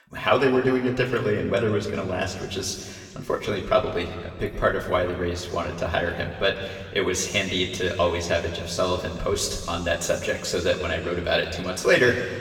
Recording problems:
room echo; noticeable; dies away in 1.9 s
off-mic speech; somewhat distant

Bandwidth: 17 kHz